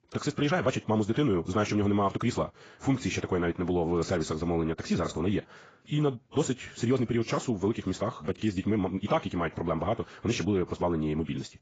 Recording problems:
garbled, watery; badly; nothing above 7.5 kHz
wrong speed, natural pitch; too fast; 1.7 times normal speed

